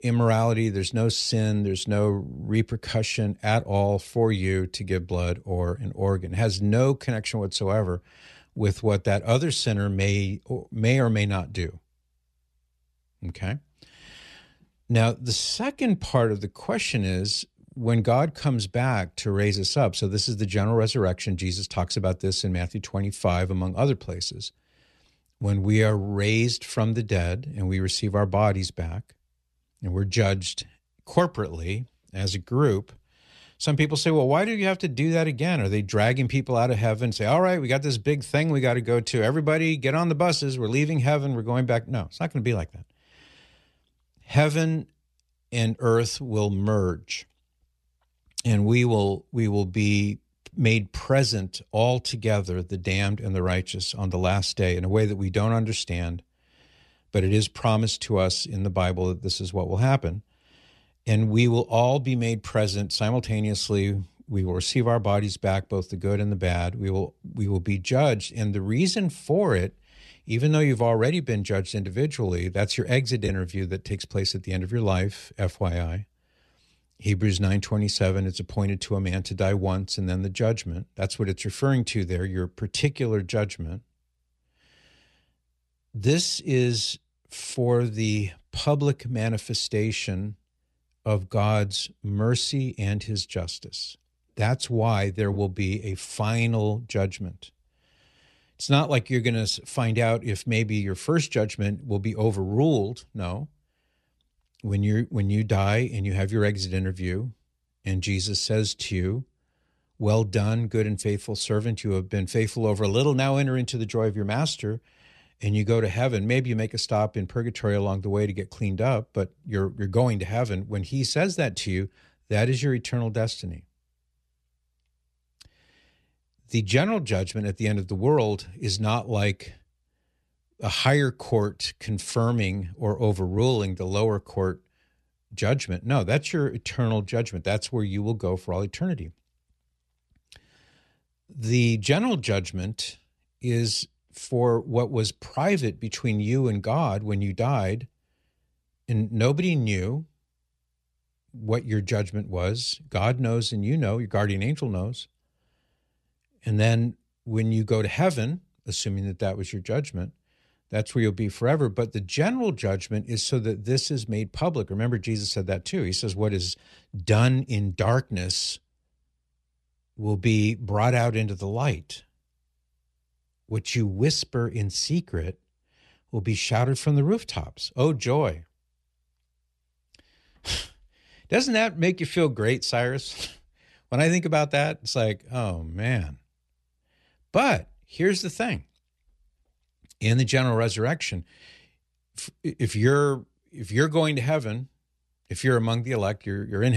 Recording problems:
abrupt cut into speech; at the end

